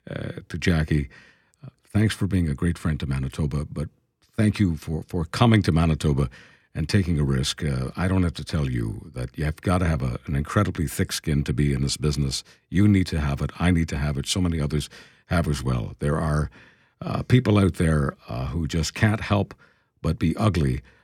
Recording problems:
none

